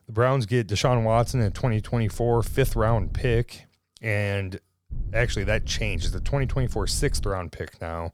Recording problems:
low rumble; faint; from 1 to 3.5 s and from 5 to 7.5 s; 25 dB below the speech

